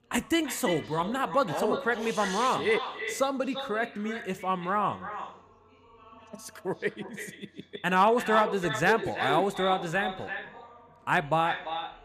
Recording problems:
echo of what is said; strong; throughout; 340 ms later, 9 dB below the speech
chatter from many people; faint; throughout; 25 dB below the speech

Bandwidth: 15 kHz